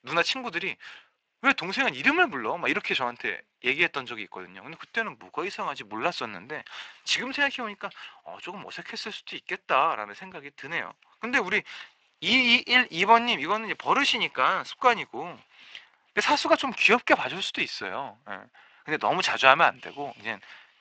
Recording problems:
thin; very; fading below 600 Hz
garbled, watery; slightly; nothing above 7.5 kHz

